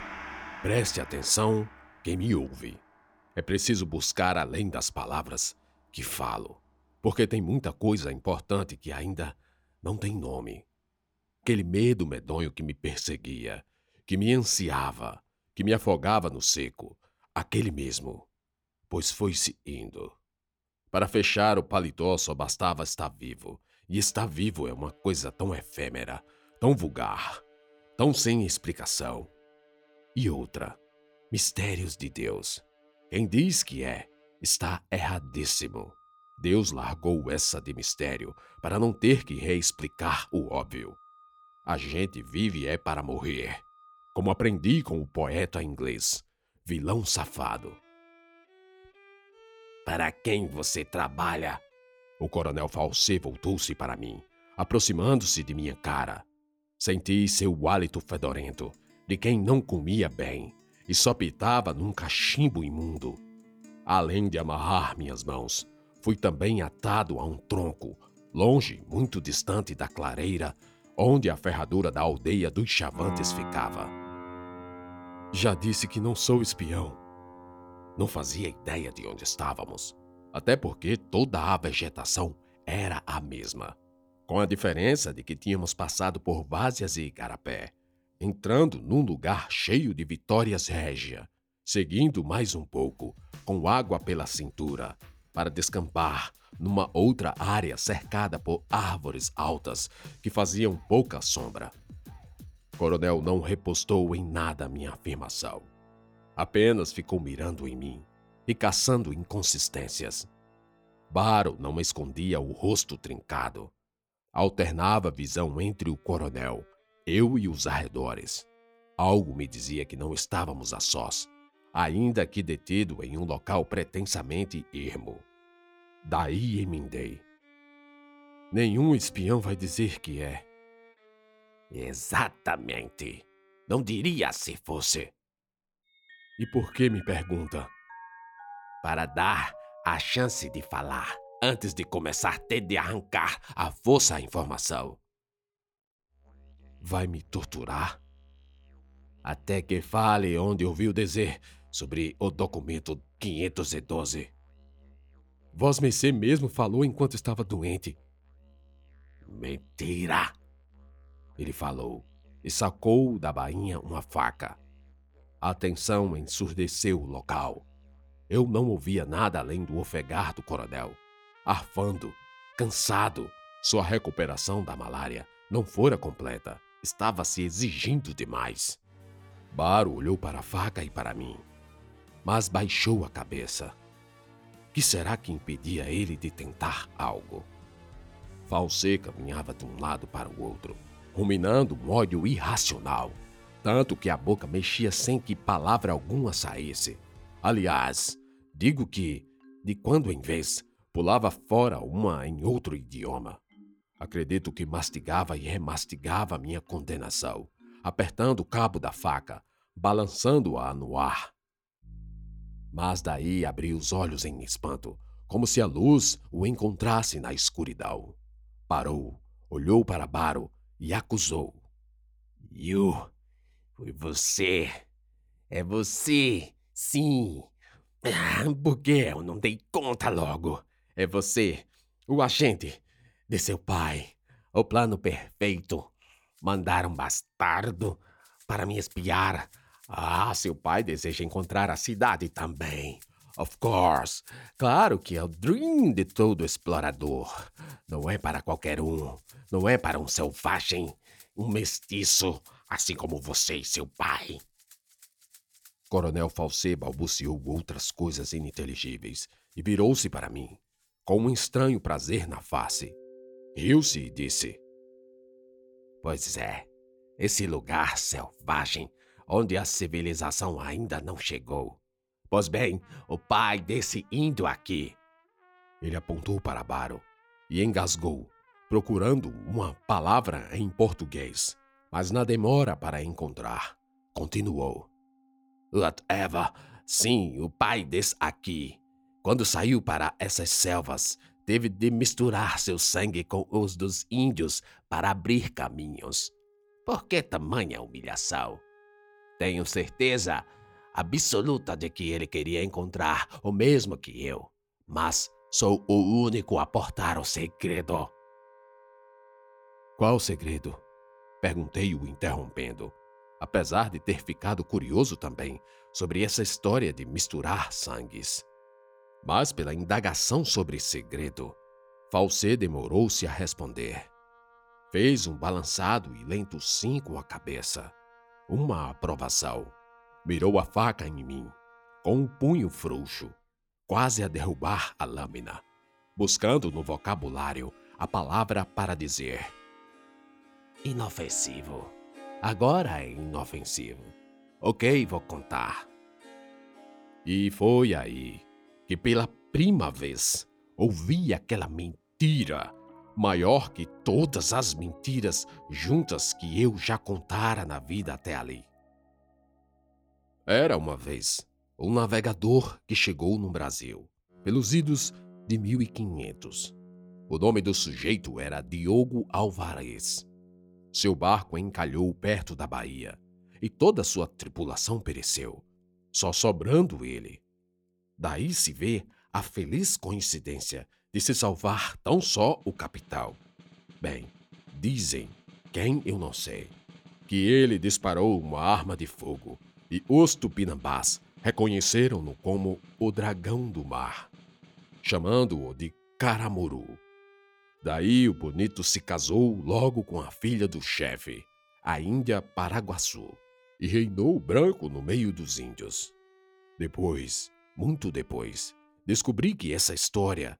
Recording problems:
background music; faint; throughout; 25 dB below the speech

